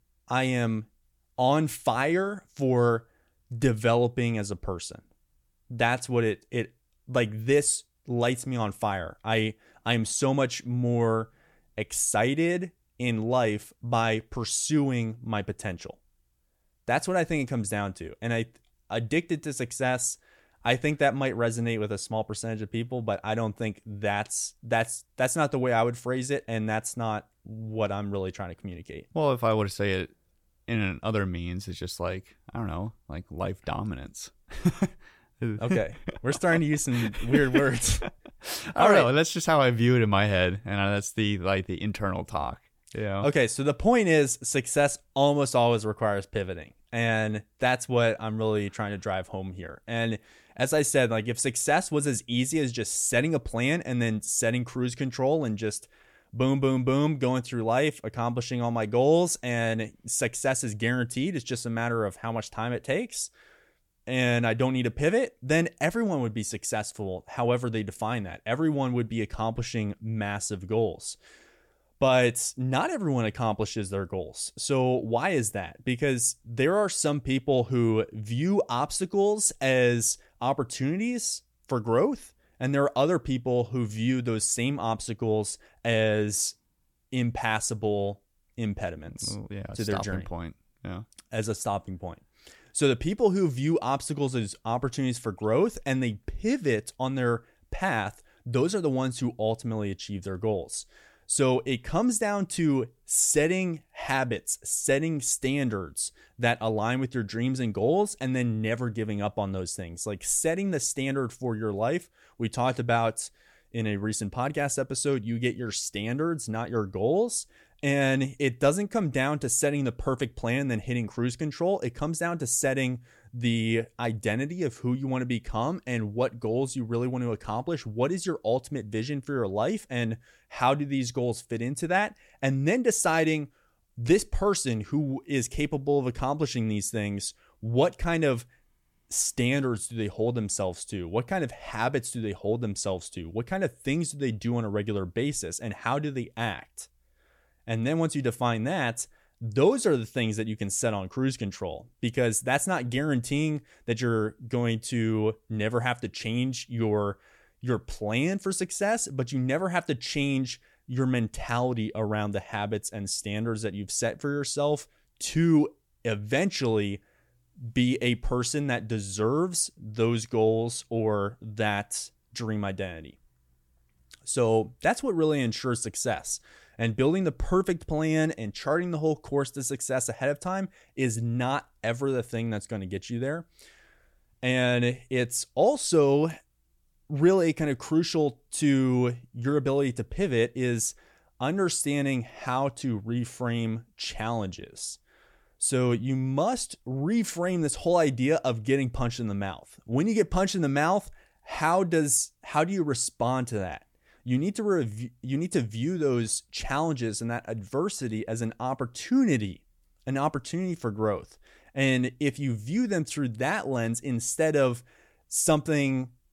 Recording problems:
none

